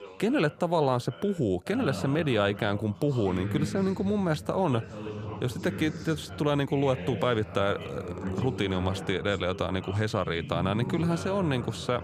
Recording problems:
background chatter; loud; throughout; 3 voices, 10 dB below the speech

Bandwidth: 15 kHz